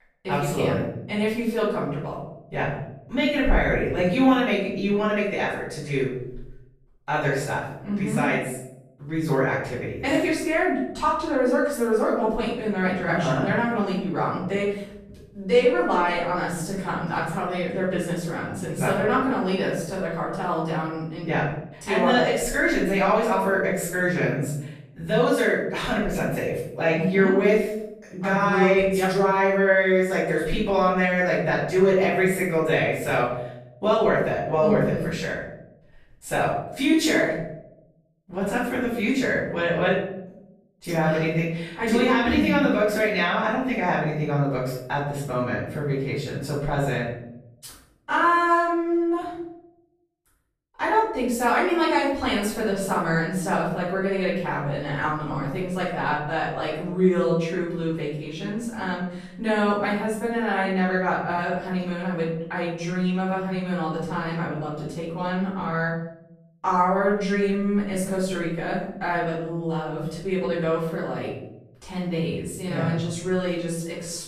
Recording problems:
off-mic speech; far
room echo; noticeable; dies away in 0.7 s

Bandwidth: 14.5 kHz